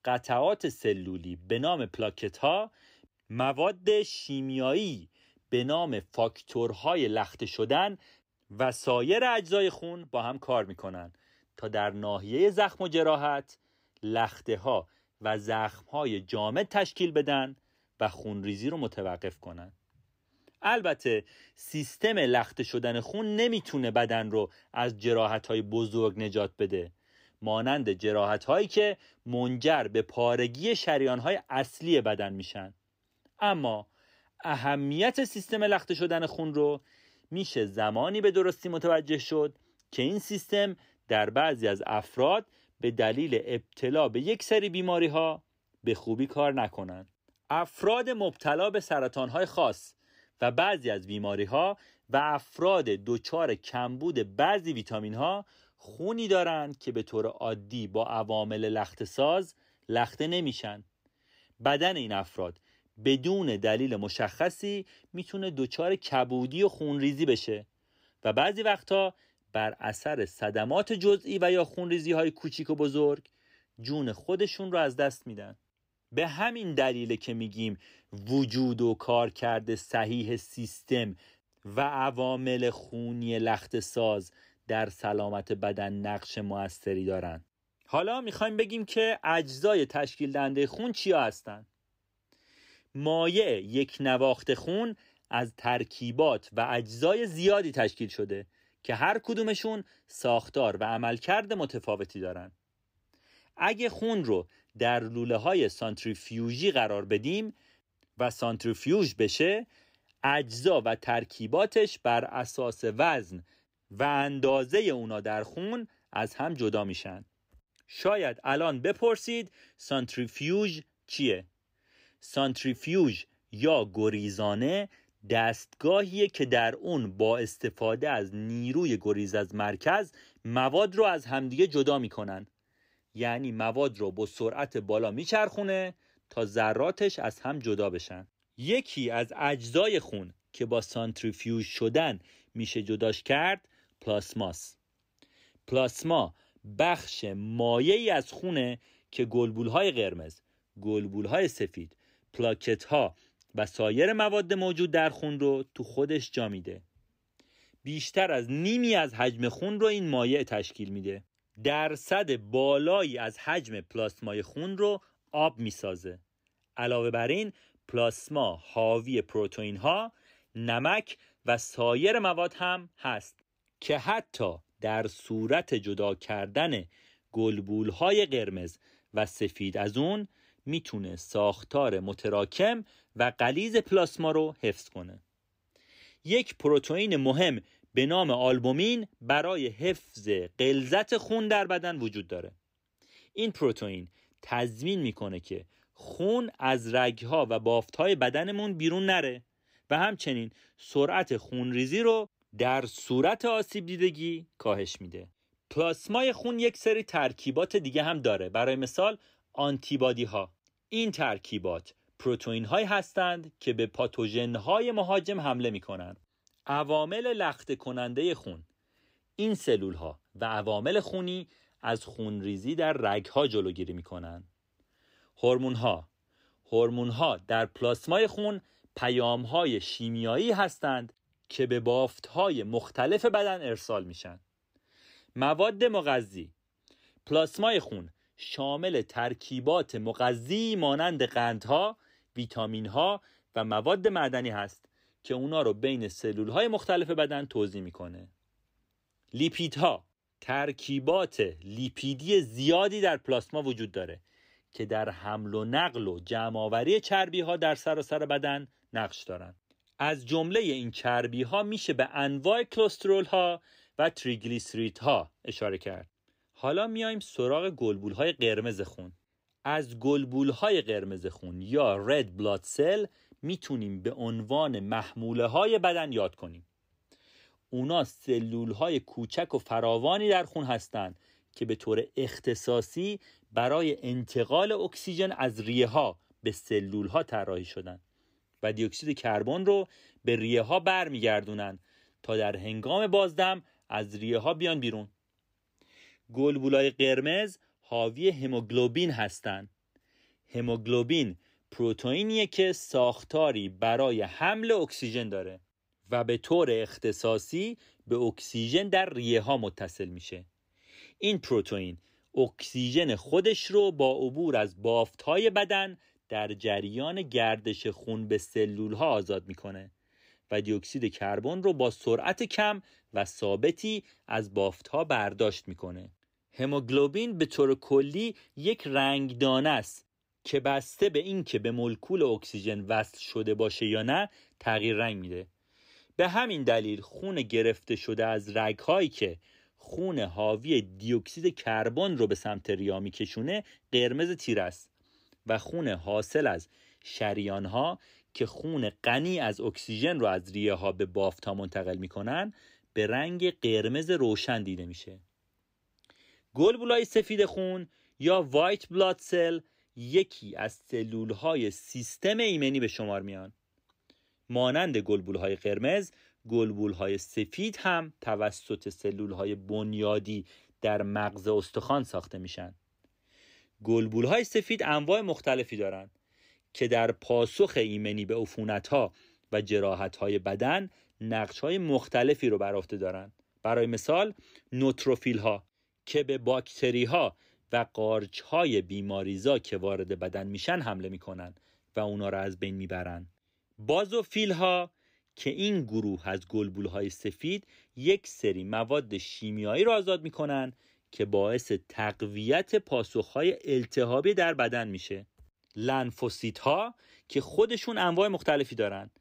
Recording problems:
none

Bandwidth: 15.5 kHz